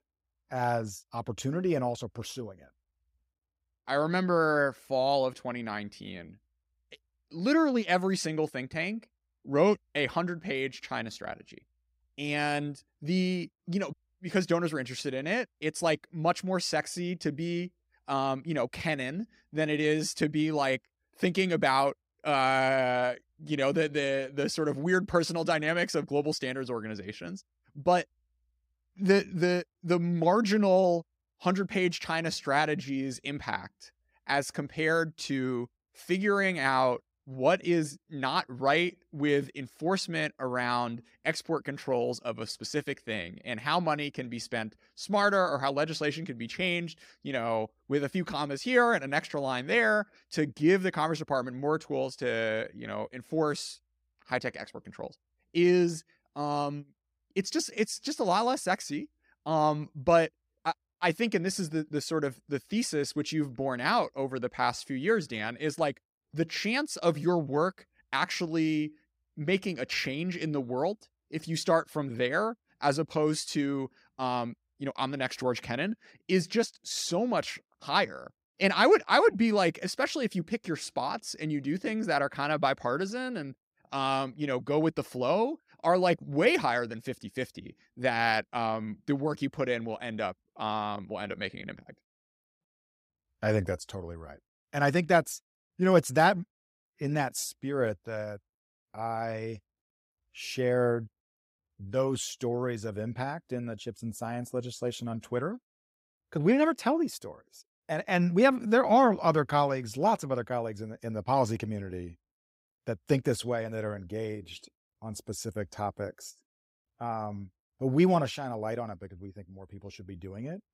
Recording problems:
none

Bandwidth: 15.5 kHz